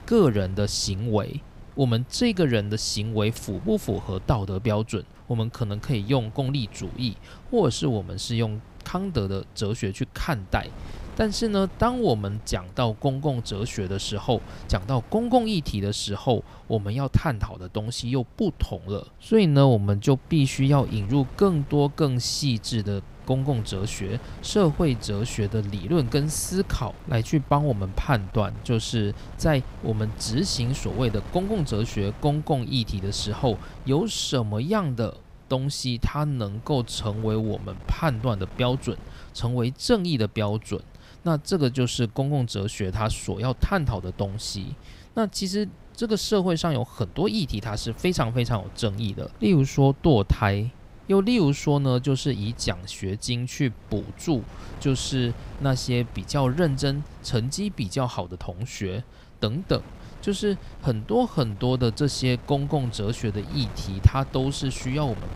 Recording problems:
wind noise on the microphone; occasional gusts; 20 dB below the speech

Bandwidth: 15.5 kHz